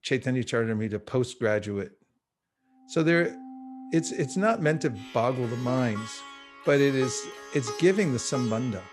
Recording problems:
background music; noticeable; from 3 s on; 15 dB below the speech

